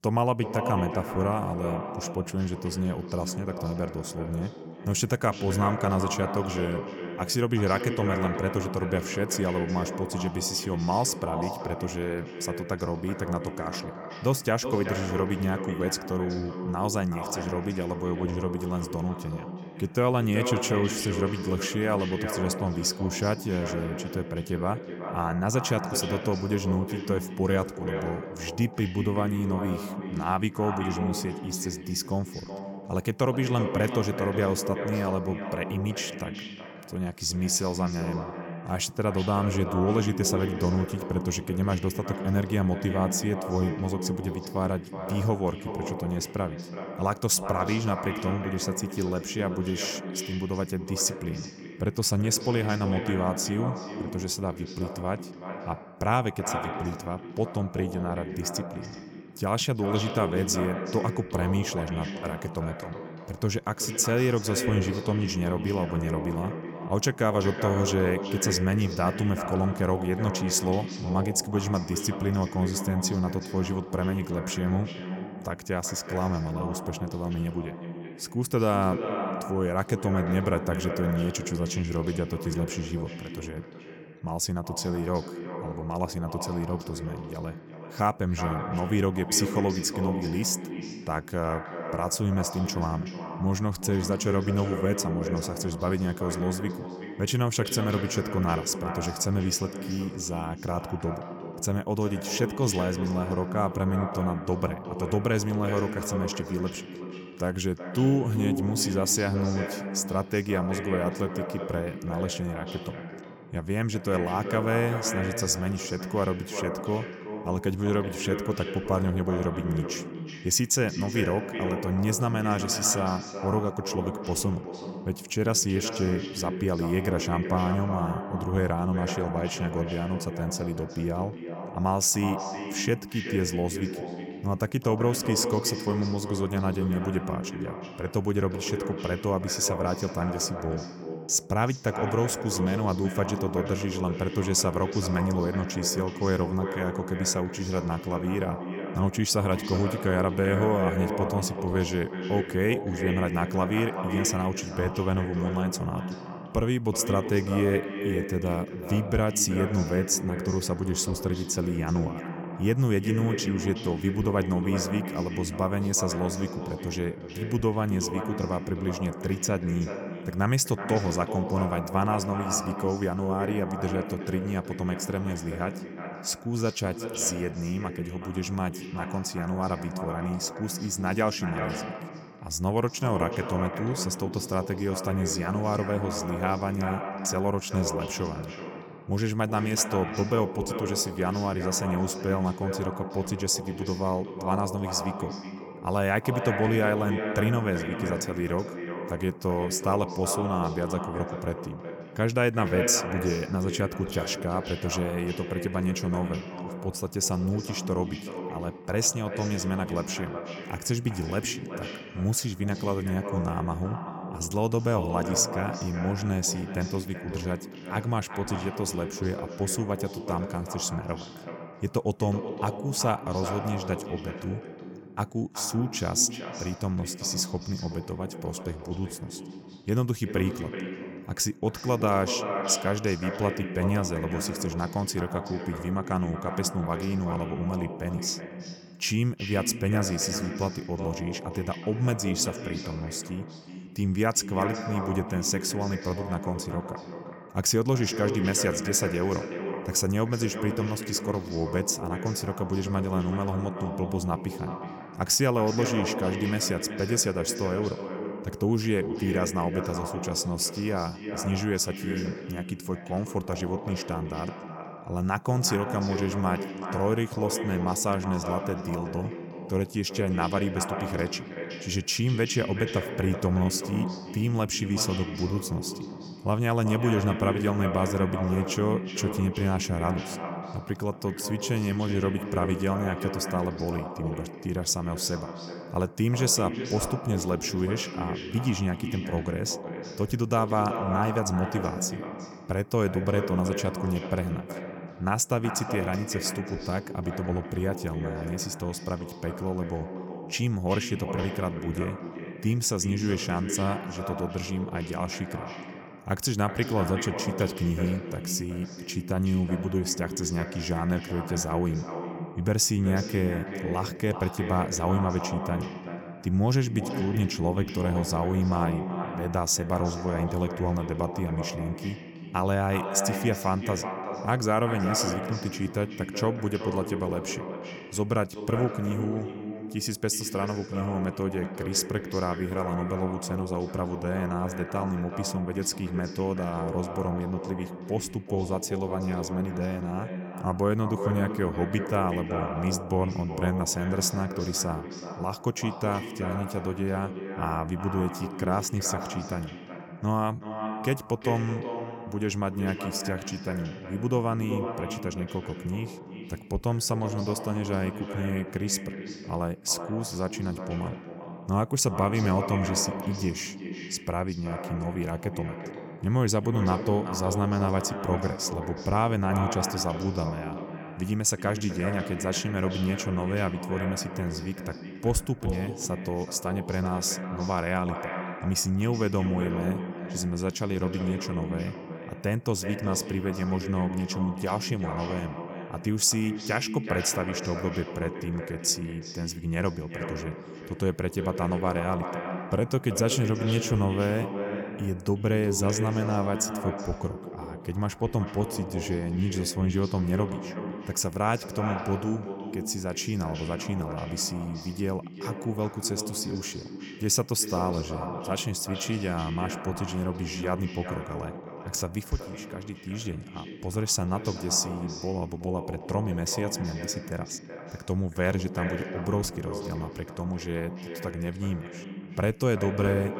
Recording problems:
echo of what is said; strong; throughout; 370 ms later, 7 dB below the speech

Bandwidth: 17 kHz